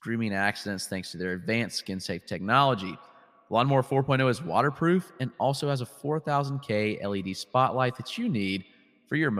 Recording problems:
echo of what is said; faint; throughout; 120 ms later, 25 dB below the speech
abrupt cut into speech; at the end

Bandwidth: 15 kHz